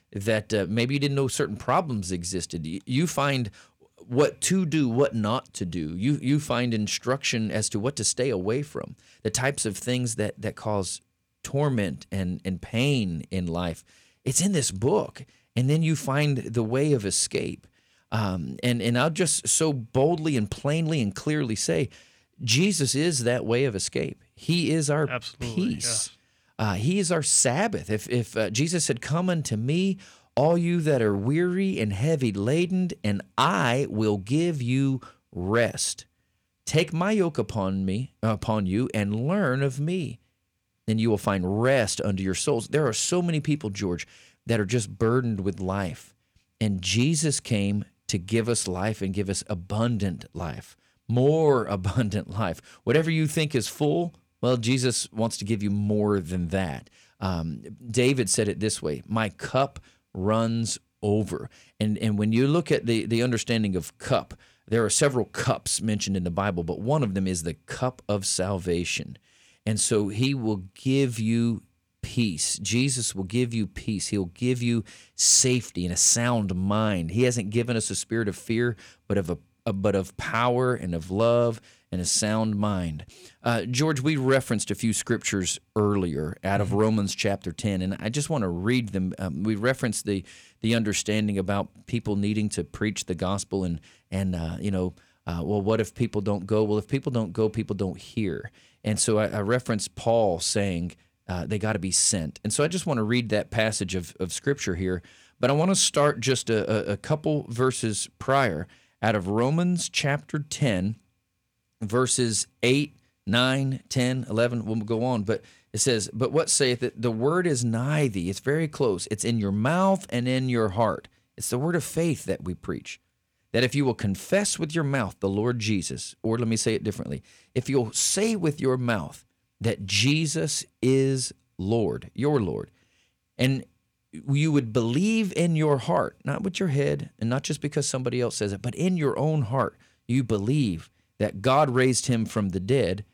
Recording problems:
none

